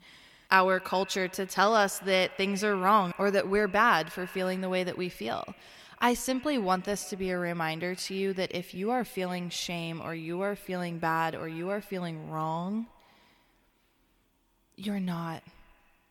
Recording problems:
echo of what is said; faint; throughout; 140 ms later, 20 dB below the speech

